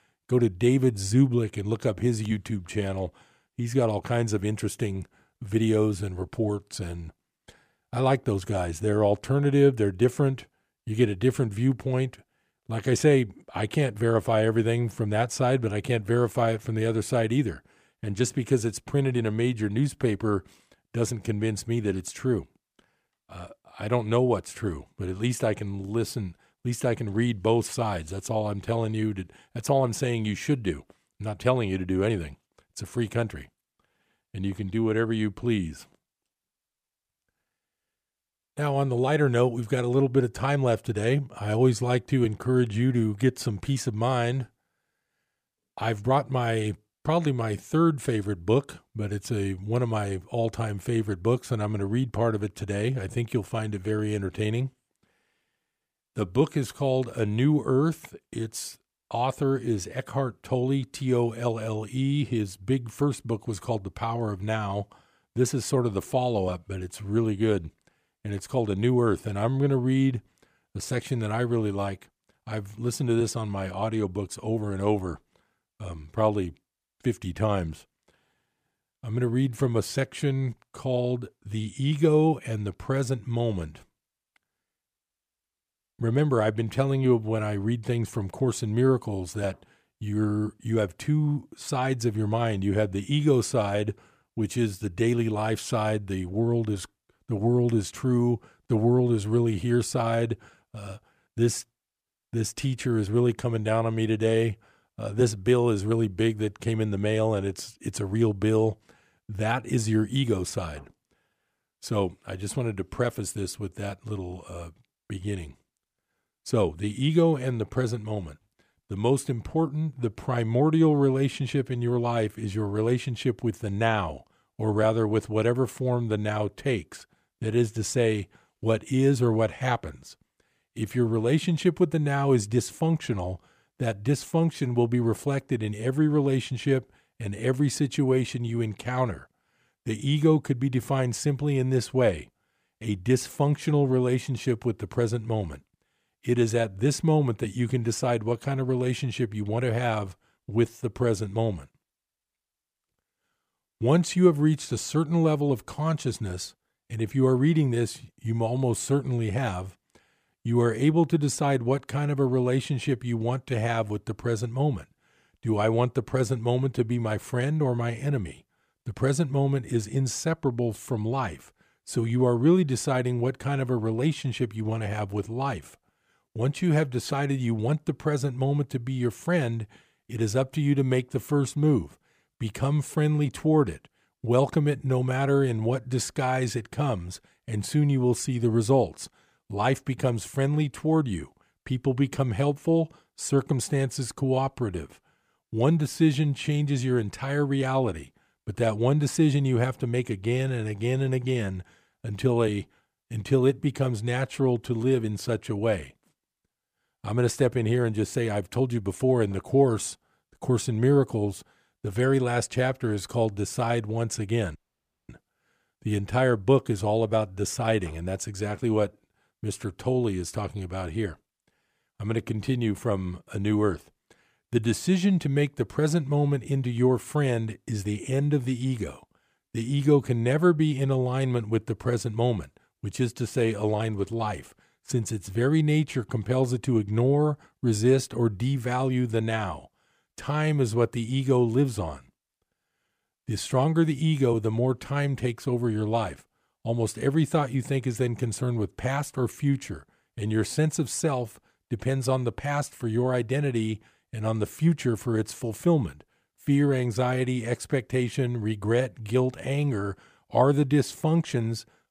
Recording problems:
audio cutting out; at 3:35 for 0.5 s

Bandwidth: 15 kHz